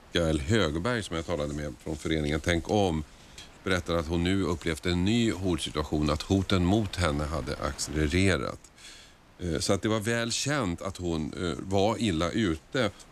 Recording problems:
wind noise on the microphone; occasional gusts; 25 dB below the speech

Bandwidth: 14.5 kHz